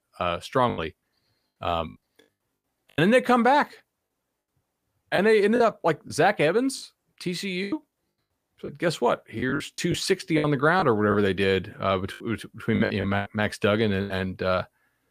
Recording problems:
choppy; very; 10% of the speech affected

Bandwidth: 15 kHz